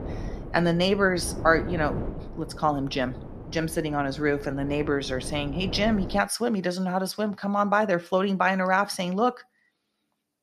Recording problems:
wind noise on the microphone; occasional gusts; until 6 s; 15 dB below the speech

